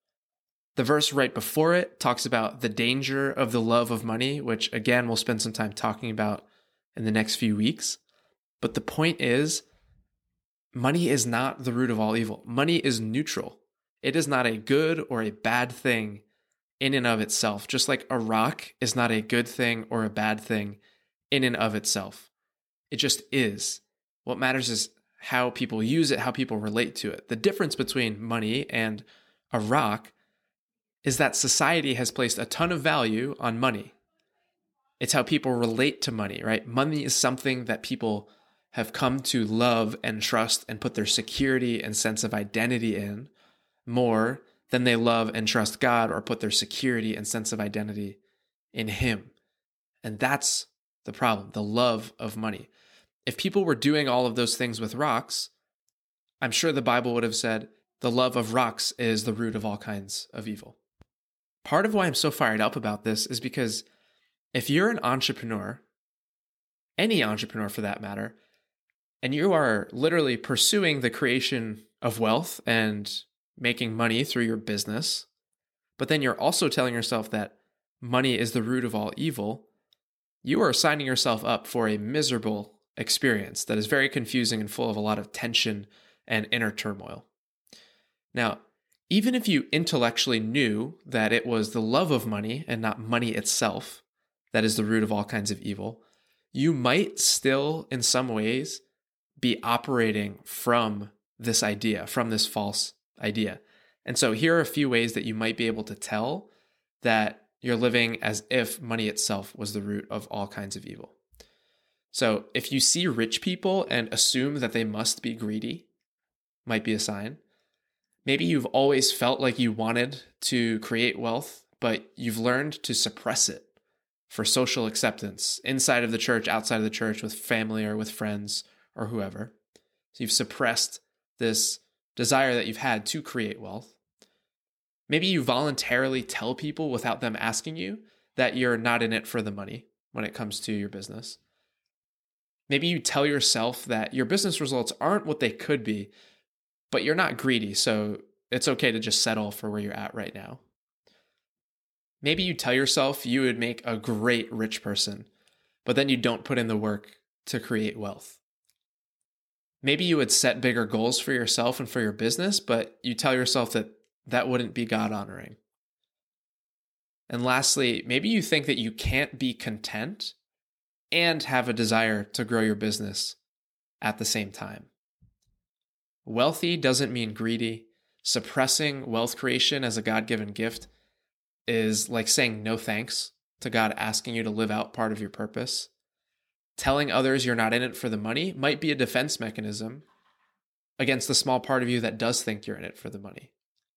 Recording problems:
none

